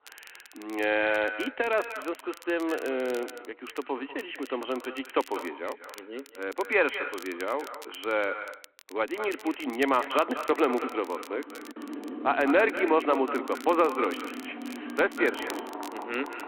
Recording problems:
echo of what is said; strong; throughout; 190 ms later, 10 dB below the speech
phone-call audio
traffic noise; noticeable; from 9.5 s on; 10 dB below the speech
crackle, like an old record; faint; 20 dB below the speech
choppy; occasionally; at 10 s; 2% of the speech affected

